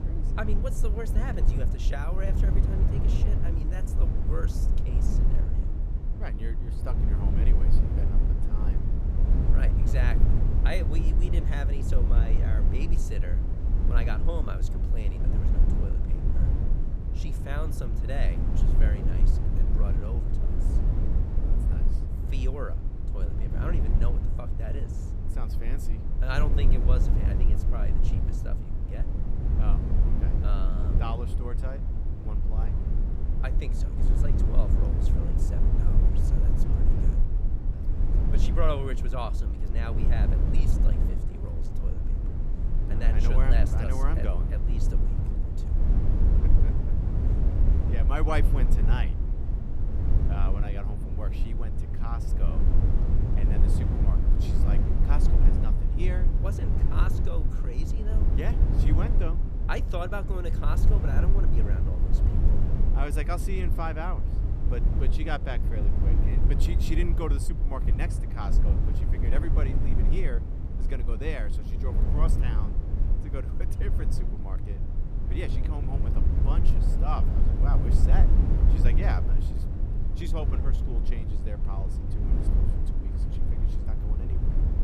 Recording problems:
low rumble; loud; throughout; 3 dB below the speech

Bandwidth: 15 kHz